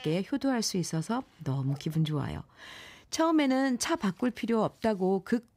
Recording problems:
animal sounds; faint; throughout; 30 dB below the speech

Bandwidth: 15.5 kHz